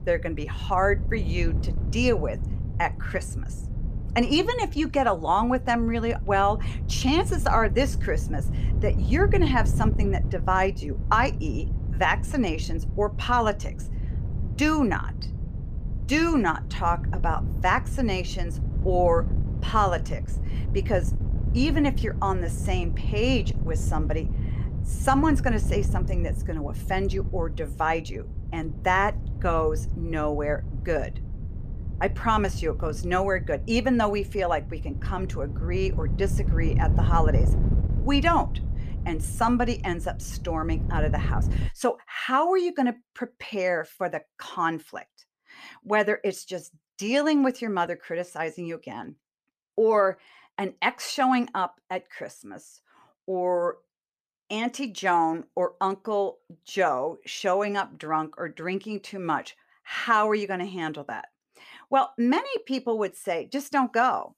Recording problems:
wind noise on the microphone; occasional gusts; until 42 s; 15 dB below the speech

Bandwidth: 14.5 kHz